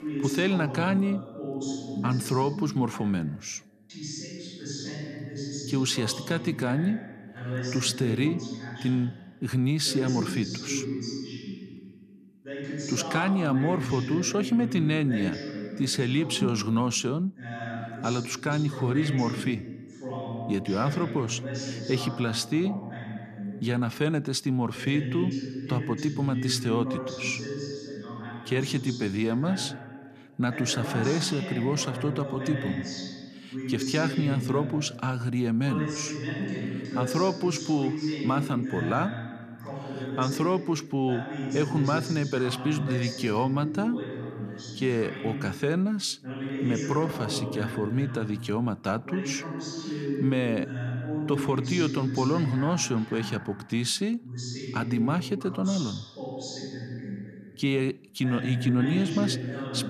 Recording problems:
voice in the background; loud; throughout; 6 dB below the speech

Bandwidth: 14 kHz